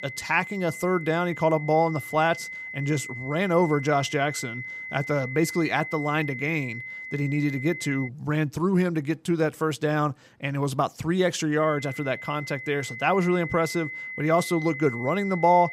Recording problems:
high-pitched whine; loud; until 8 s and from 12 s on; 2 kHz, 9 dB below the speech

